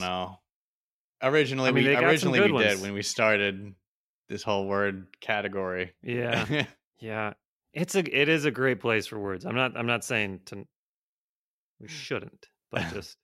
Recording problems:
abrupt cut into speech; at the start

